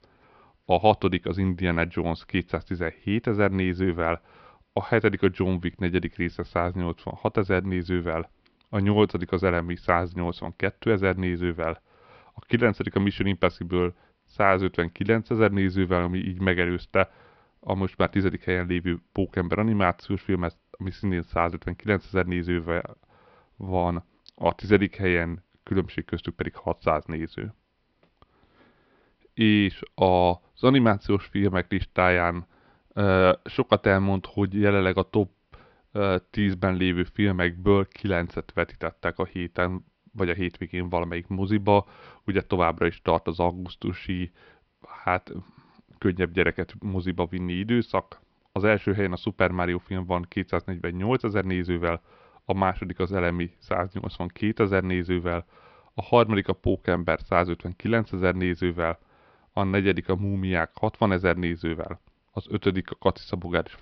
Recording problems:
high frequencies cut off; noticeable; nothing above 5.5 kHz

